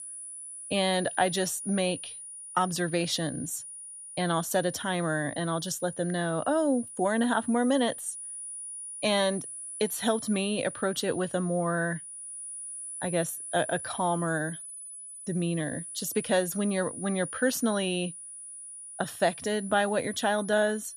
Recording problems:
high-pitched whine; loud; throughout; 9.5 kHz, 10 dB below the speech

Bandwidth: 14 kHz